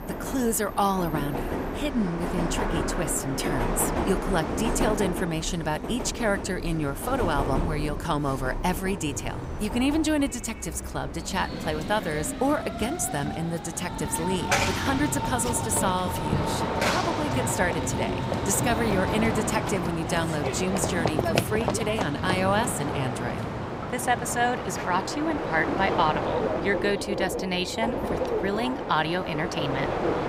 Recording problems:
train or aircraft noise; loud; throughout; 2 dB below the speech

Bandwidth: 15.5 kHz